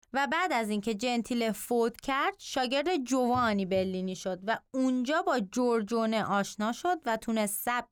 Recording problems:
none

